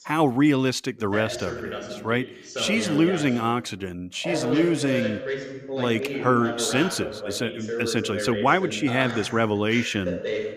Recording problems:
voice in the background; loud; throughout; 7 dB below the speech

